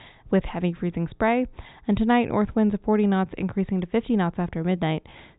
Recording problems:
high frequencies cut off; severe; nothing above 4 kHz

